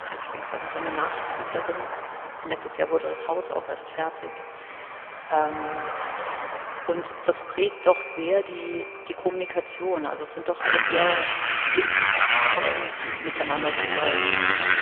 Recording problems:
phone-call audio; poor line; nothing above 3 kHz
echo of what is said; strong; throughout; 80 ms later, 10 dB below the speech
traffic noise; very loud; throughout; 3 dB above the speech

